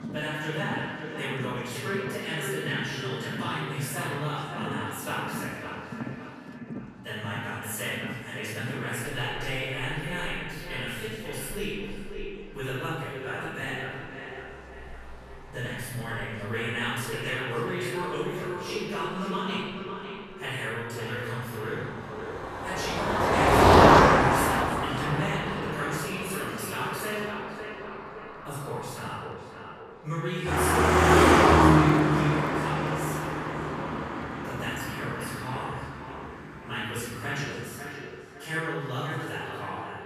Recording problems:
echo of what is said; strong; throughout; 550 ms later, 7 dB below the speech
room echo; strong; dies away in 1.3 s
off-mic speech; far
traffic noise; very loud; throughout; 10 dB above the speech
murmuring crowd; faint; throughout; 30 dB below the speech

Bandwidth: 14 kHz